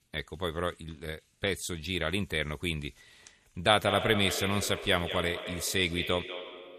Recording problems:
echo of what is said; strong; from 3.5 s on; 190 ms later, 7 dB below the speech

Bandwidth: 14.5 kHz